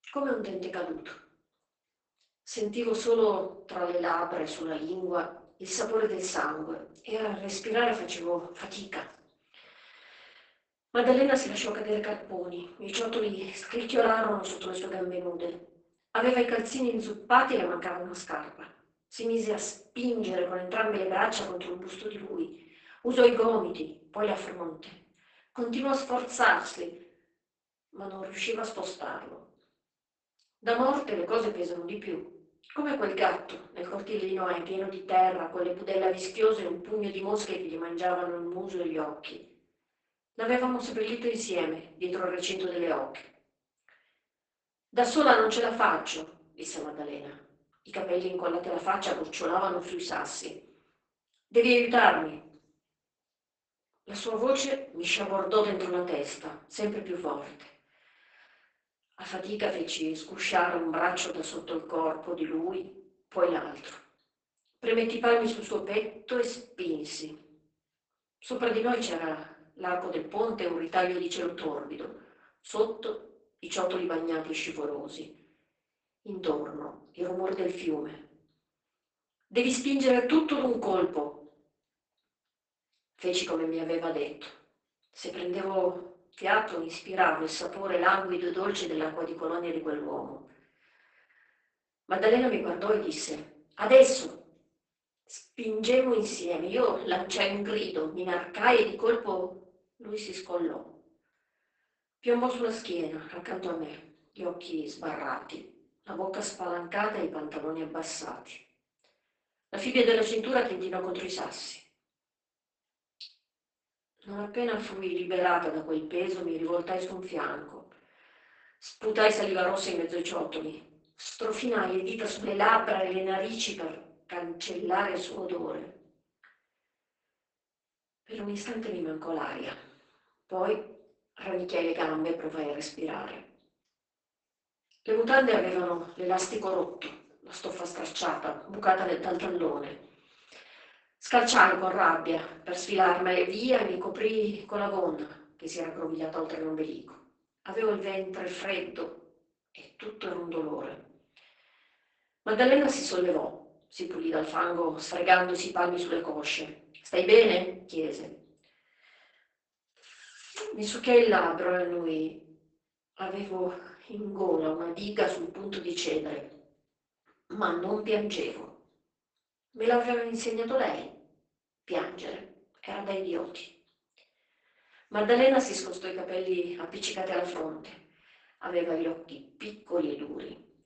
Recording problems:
off-mic speech; far
garbled, watery; badly; nothing above 8 kHz
thin; somewhat; fading below 350 Hz
room echo; slight; dies away in 0.4 s

